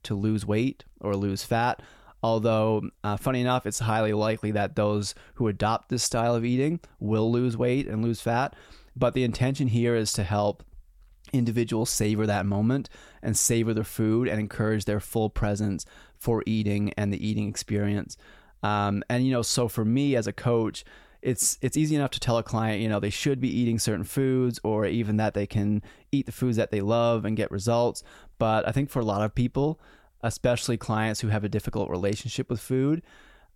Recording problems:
none

